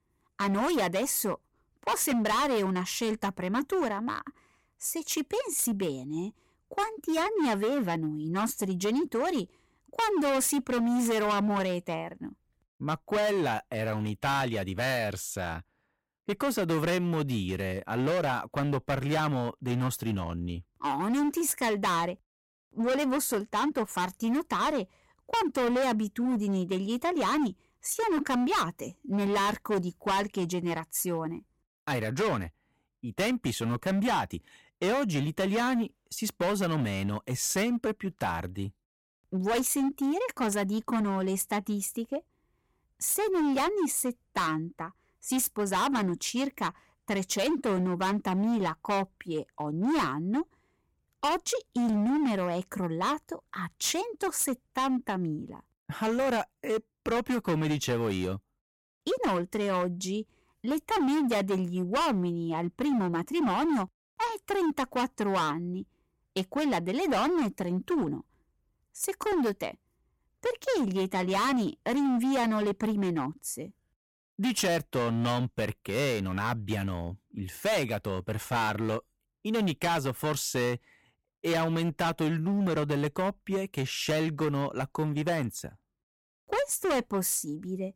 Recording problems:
distortion; heavy; 16% of the sound clipped

